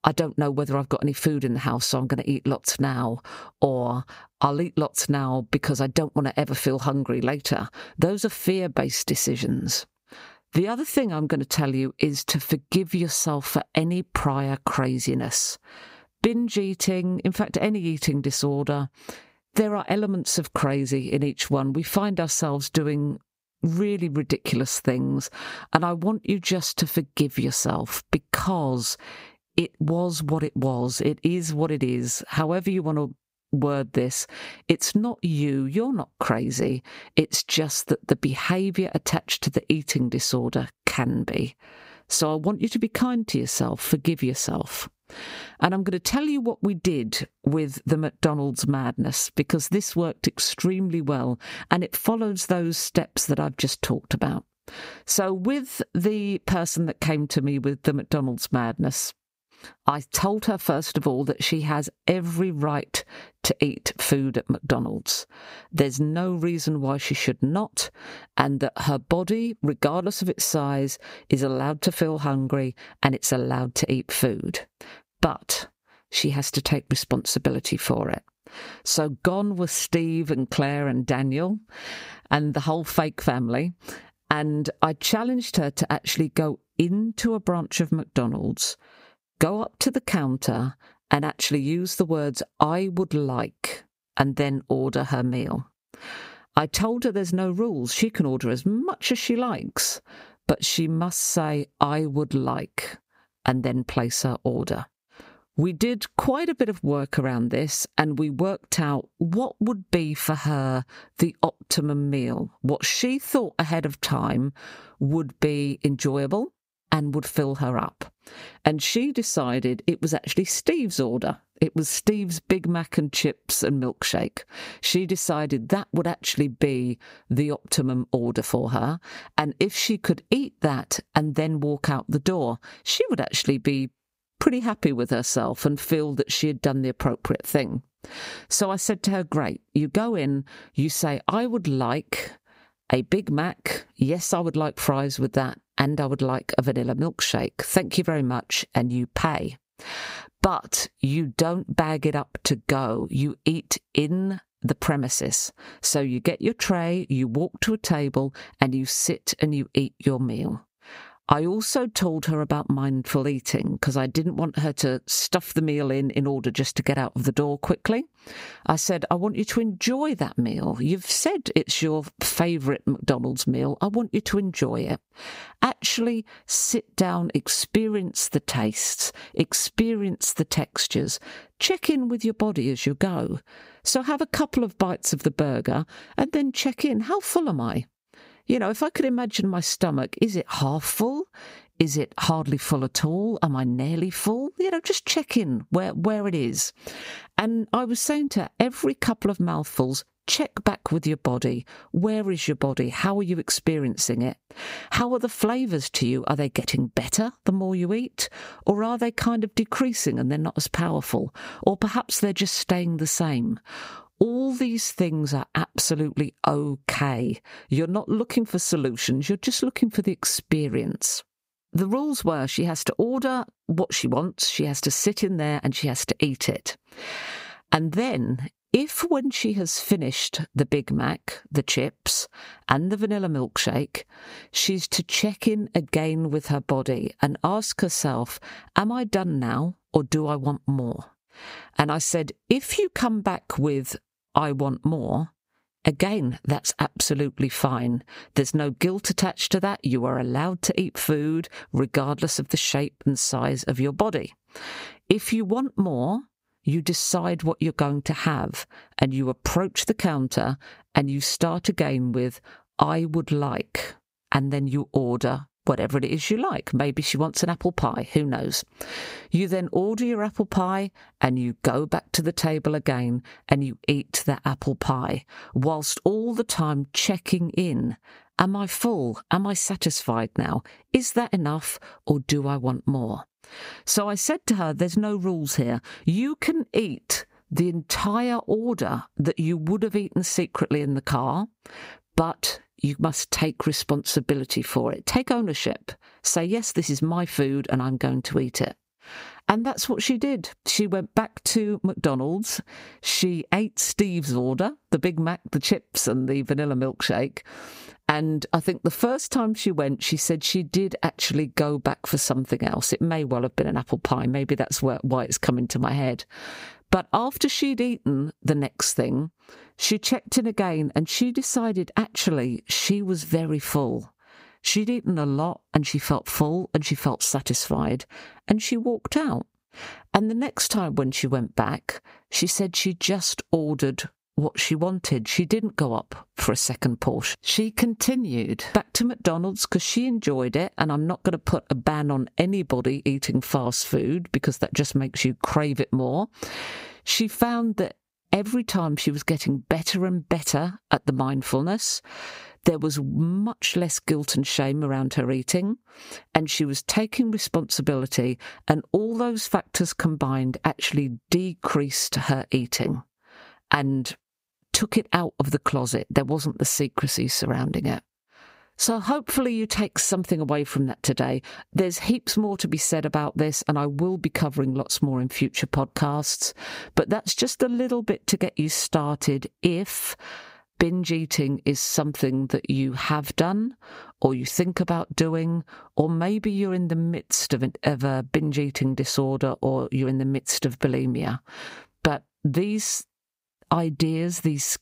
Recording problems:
squashed, flat; somewhat

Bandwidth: 15.5 kHz